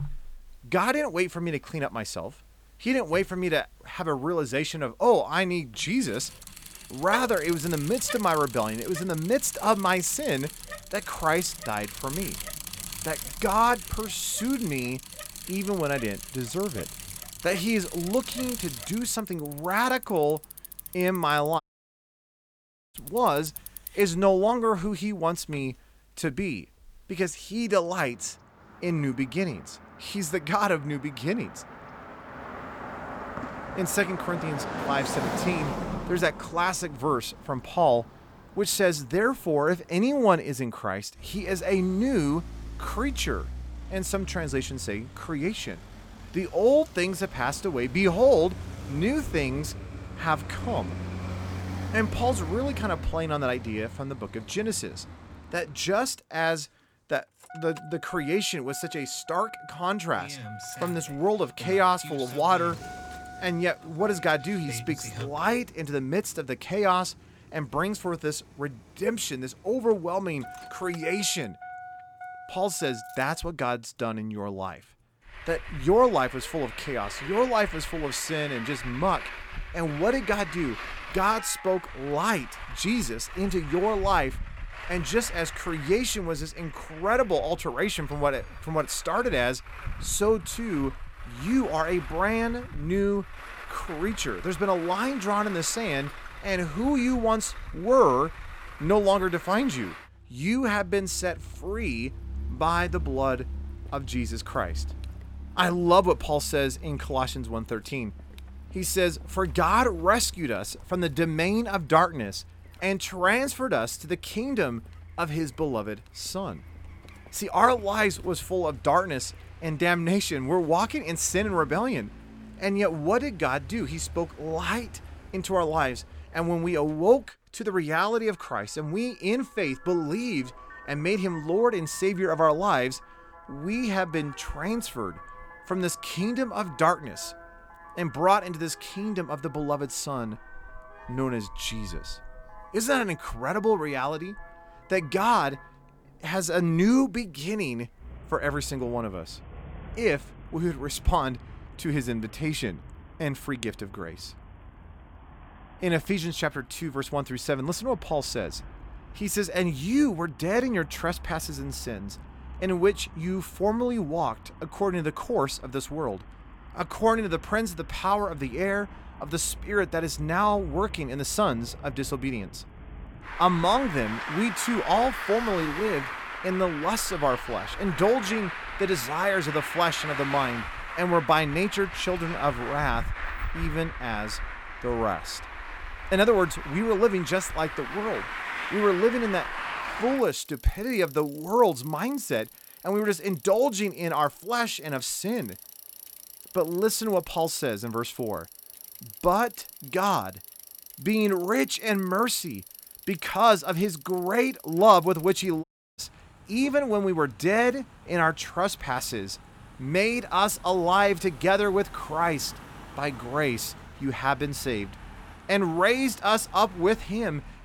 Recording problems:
traffic noise; noticeable; throughout; 15 dB below the speech
audio cutting out; at 22 s for 1.5 s and at 3:26

